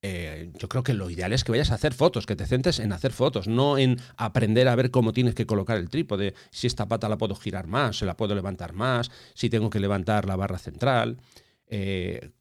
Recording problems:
none

